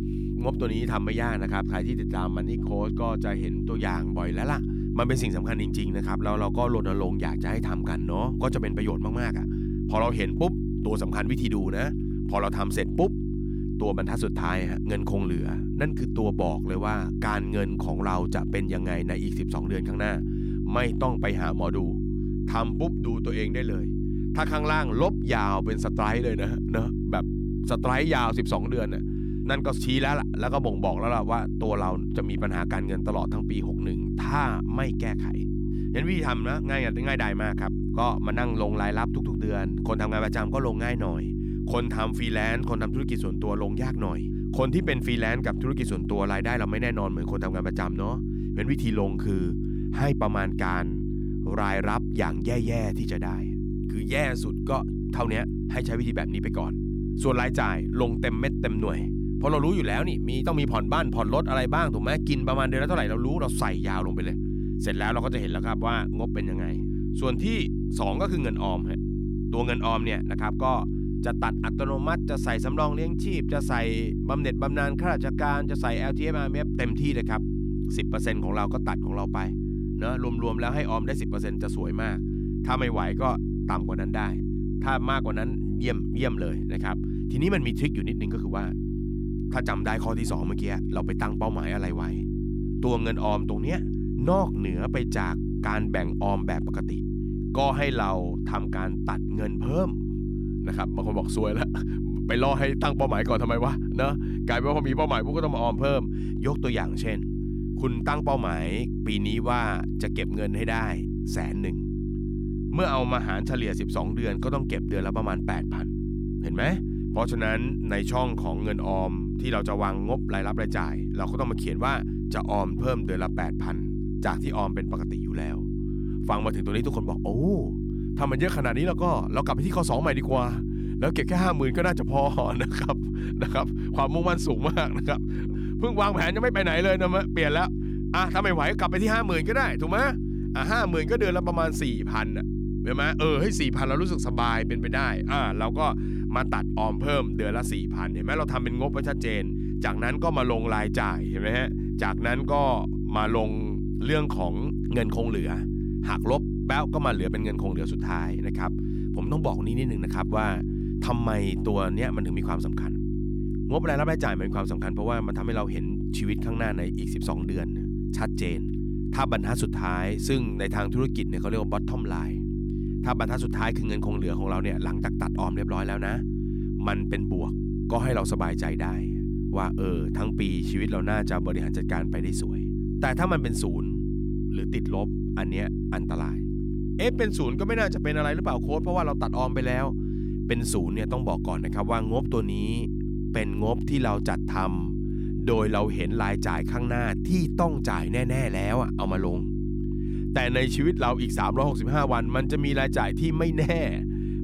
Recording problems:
electrical hum; loud; throughout; 50 Hz, 7 dB below the speech

